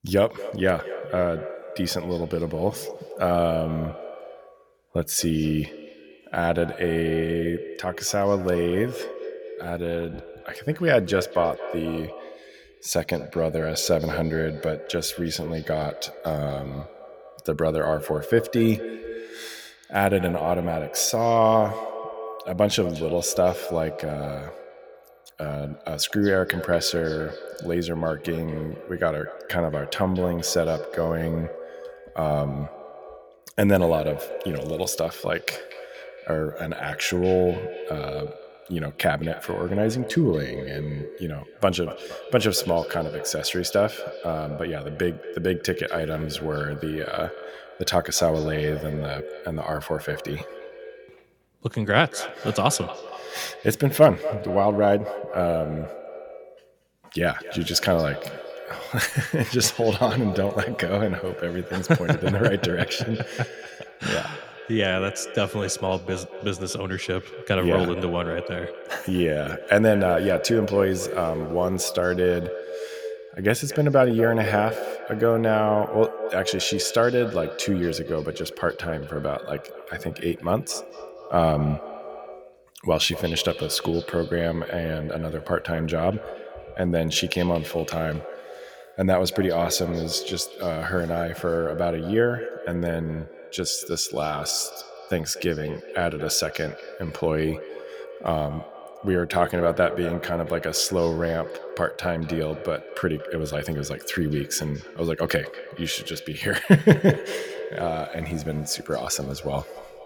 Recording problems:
echo of what is said; strong; throughout; 230 ms later, 10 dB below the speech

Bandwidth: 18.5 kHz